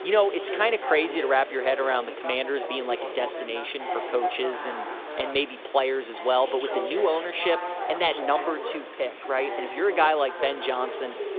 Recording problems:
phone-call audio
background chatter; loud; throughout; 3 voices, 7 dB below the speech
hiss; noticeable; throughout; 15 dB below the speech

